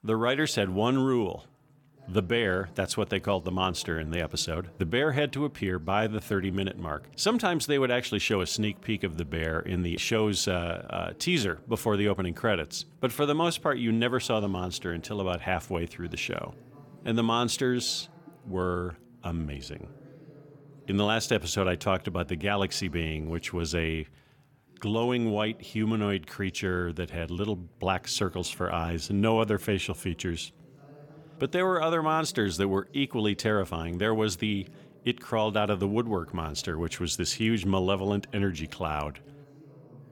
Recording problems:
voice in the background; faint; throughout; 25 dB below the speech

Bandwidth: 17.5 kHz